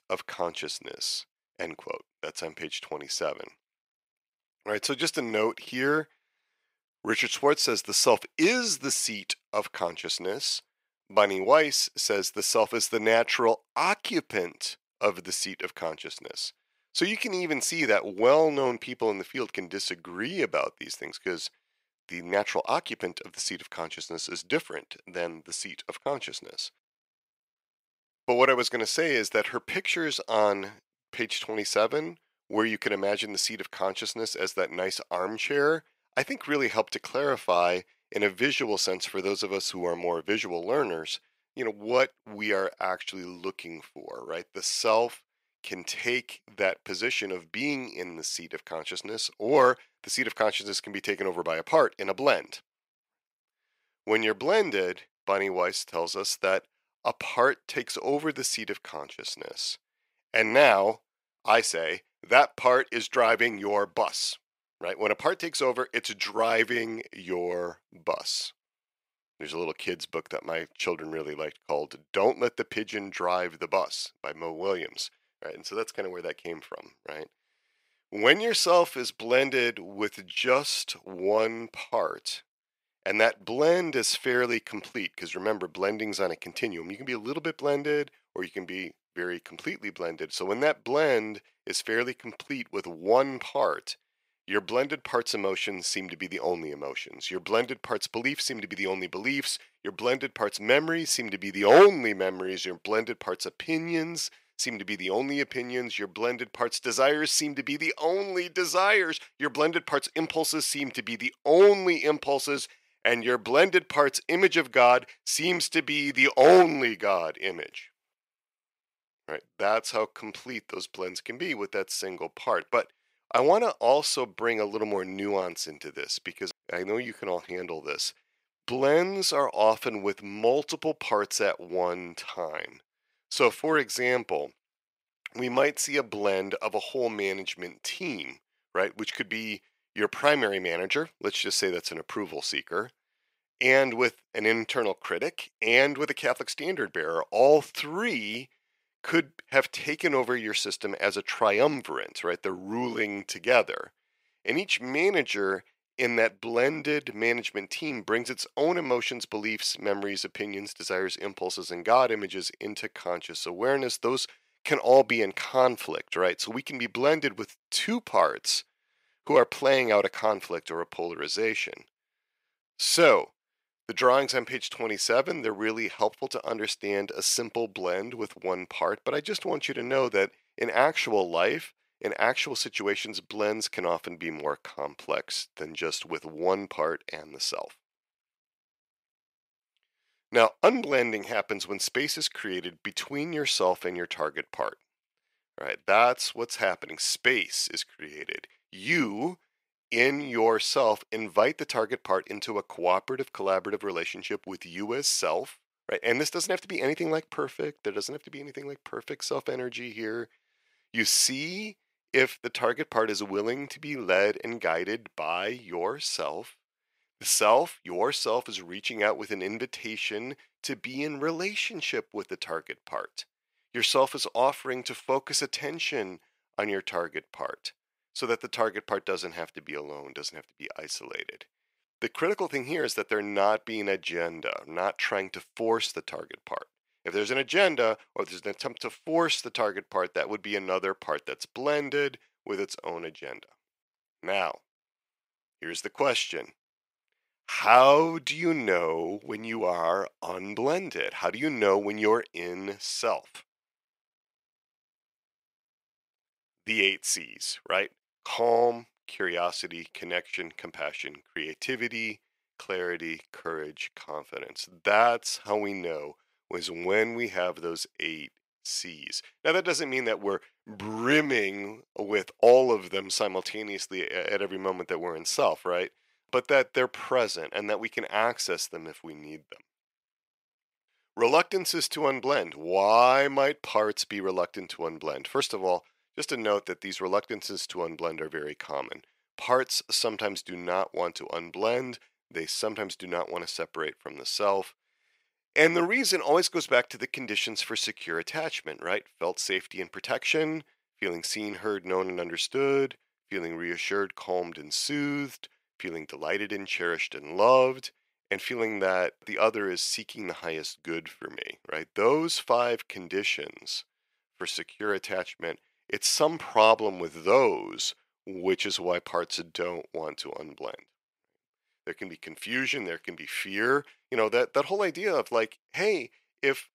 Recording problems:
thin; somewhat; fading below 500 Hz

